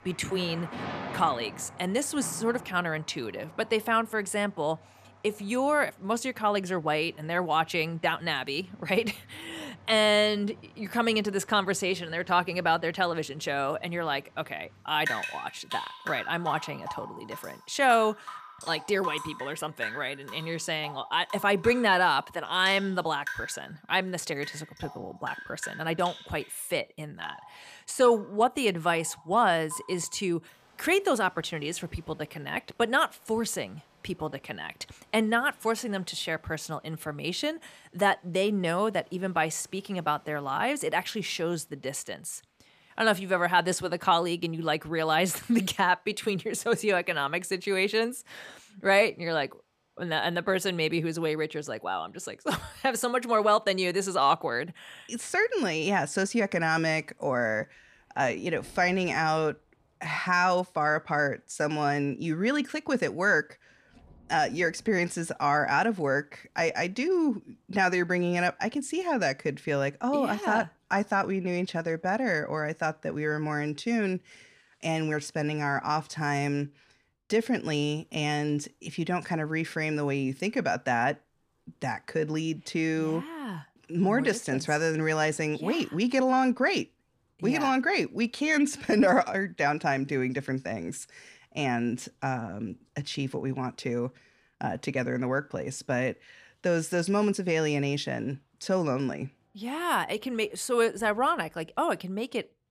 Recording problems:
rain or running water; noticeable; throughout; 15 dB below the speech

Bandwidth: 14.5 kHz